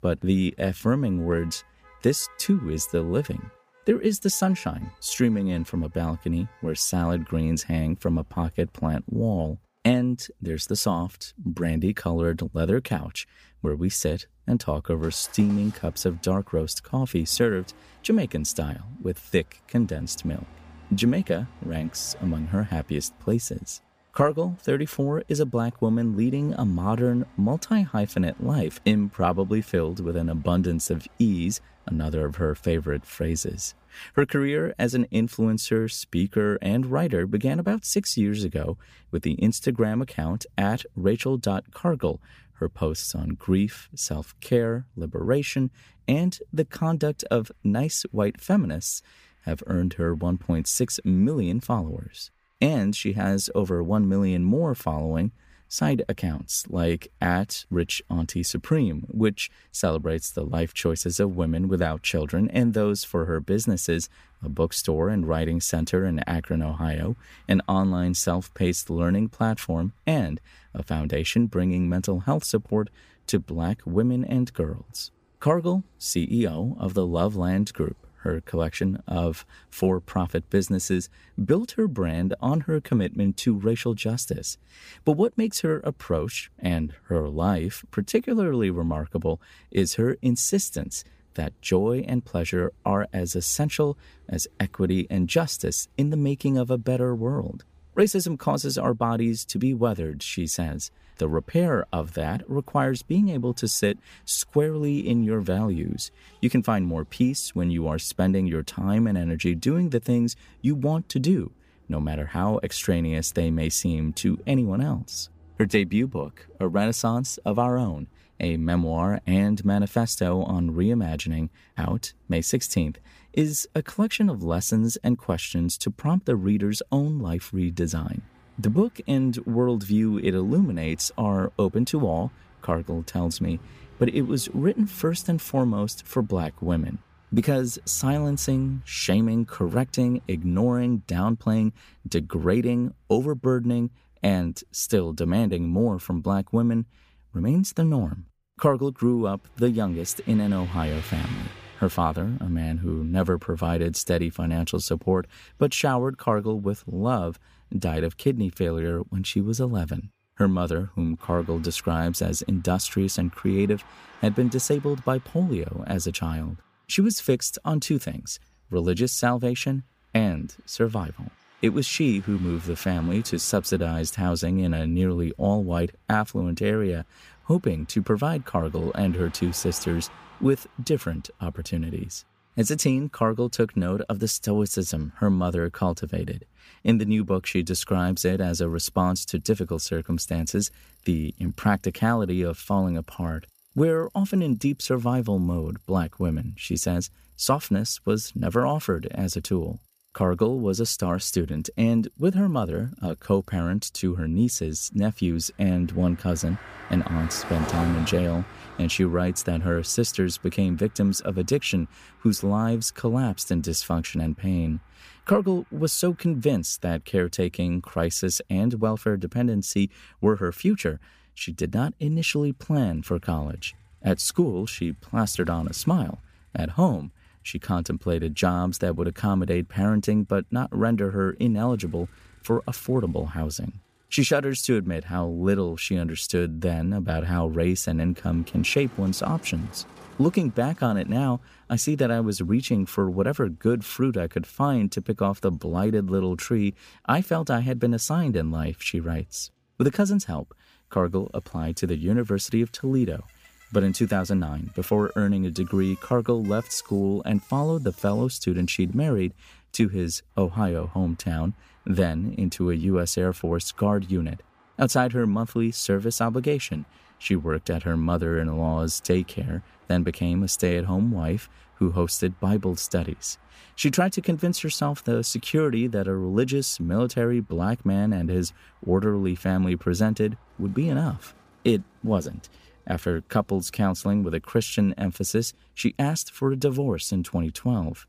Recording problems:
traffic noise; faint; throughout; 25 dB below the speech

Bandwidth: 15 kHz